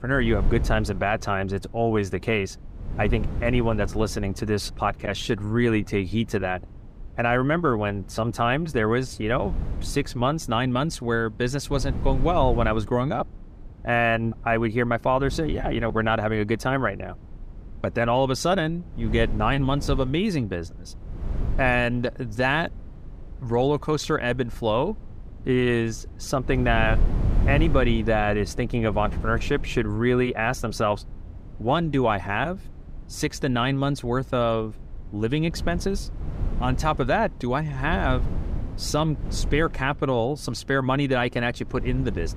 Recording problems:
wind noise on the microphone; occasional gusts; 20 dB below the speech

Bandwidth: 15 kHz